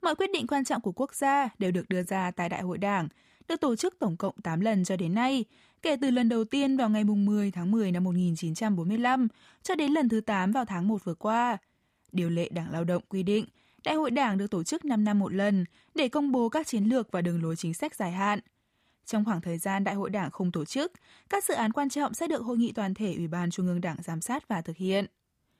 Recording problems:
none

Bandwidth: 15 kHz